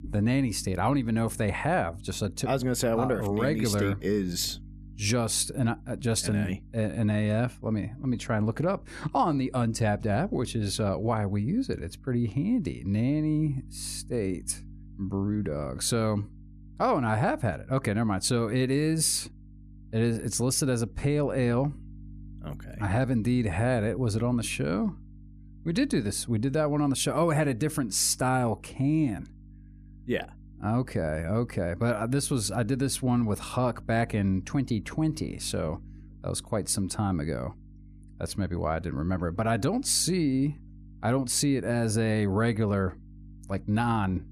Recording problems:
electrical hum; faint; throughout; 50 Hz, 30 dB below the speech

